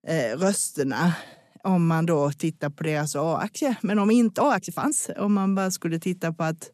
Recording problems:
uneven, jittery; strongly; from 0.5 to 5.5 s

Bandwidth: 13.5 kHz